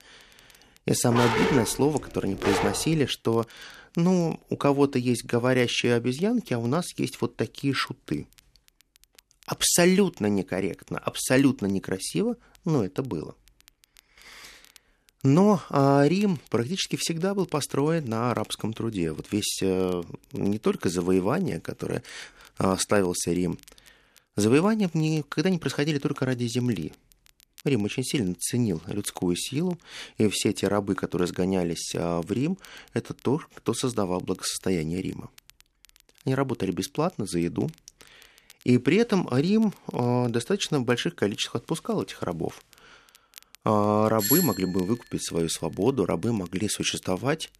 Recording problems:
crackle, like an old record; faint; 30 dB below the speech
dog barking; loud; from 1 to 3 s; peak 2 dB above the speech
doorbell; loud; at 44 s; peak 2 dB above the speech

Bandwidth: 14 kHz